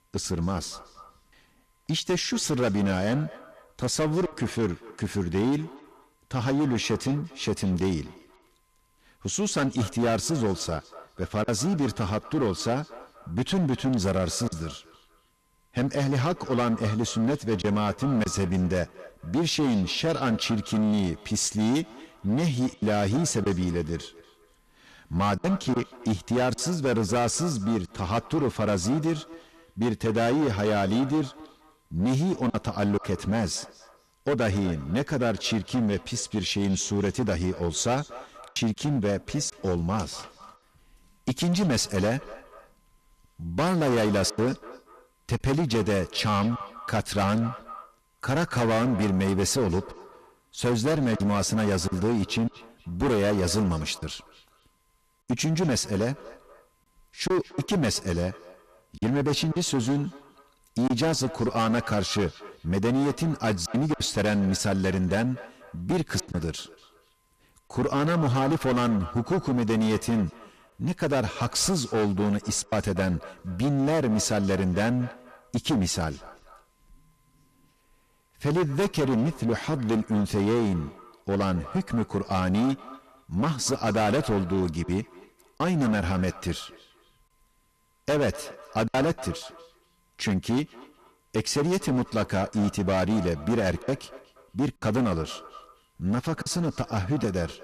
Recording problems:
distortion; heavy; 14% of the sound clipped
echo of what is said; faint; throughout; 240 ms later, 20 dB below the speech
choppy; occasionally; 2% of the speech affected

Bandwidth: 14 kHz